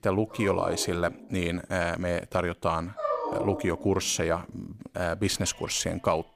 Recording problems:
animal sounds; loud; throughout; 7 dB below the speech

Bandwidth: 15 kHz